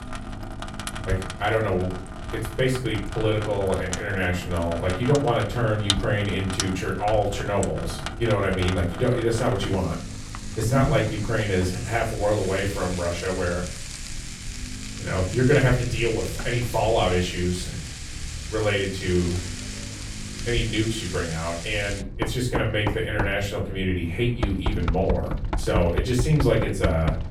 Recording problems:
off-mic speech; far
room echo; slight; dies away in 0.4 s
household noises; loud; throughout; 9 dB below the speech
low rumble; faint; throughout; 25 dB below the speech

